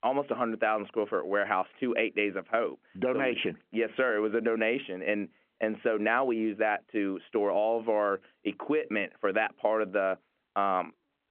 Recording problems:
phone-call audio

